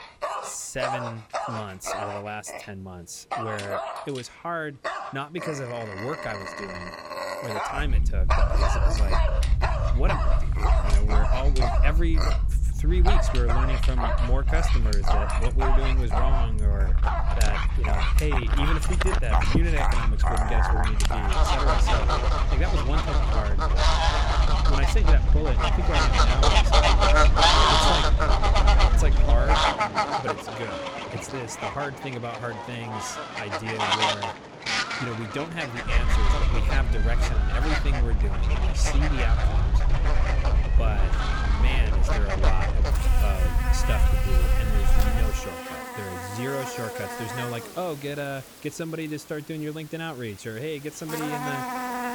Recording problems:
animal sounds; very loud; throughout; 5 dB above the speech
low rumble; noticeable; from 8 to 30 s and from 36 to 45 s; 10 dB below the speech

